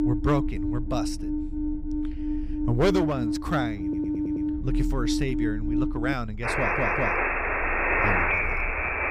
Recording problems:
alarms or sirens; very loud; throughout; 3 dB above the speech
low rumble; faint; throughout; 25 dB below the speech
audio stuttering; at 4 s and at 6.5 s

